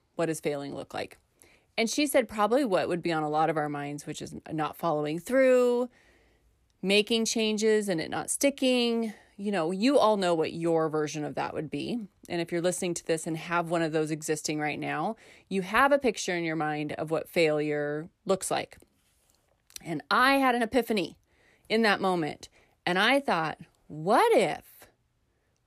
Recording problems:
none

